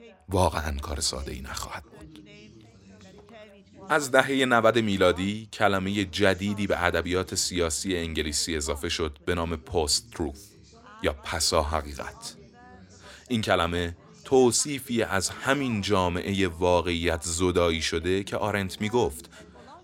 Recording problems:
background chatter; faint; throughout; 3 voices, 25 dB below the speech

